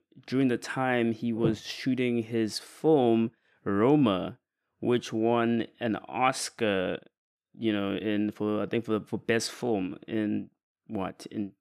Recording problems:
none

